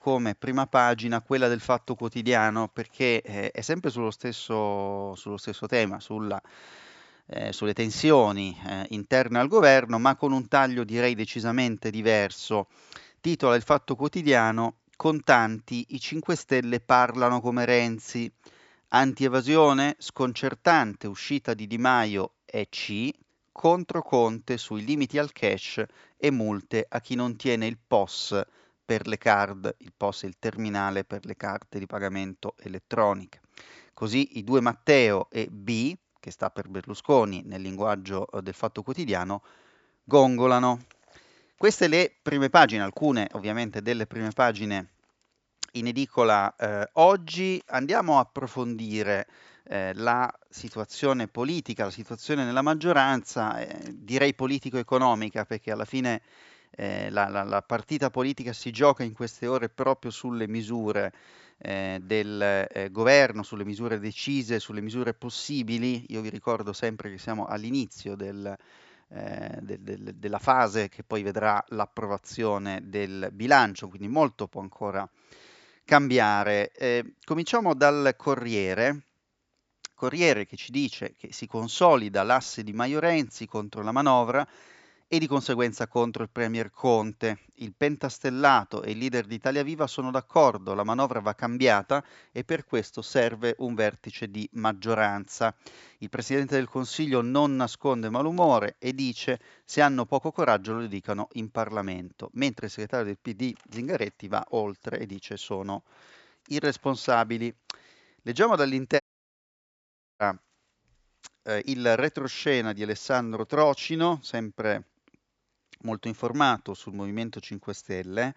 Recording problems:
high frequencies cut off; noticeable; nothing above 8 kHz
audio cutting out; at 1:49 for 1 s

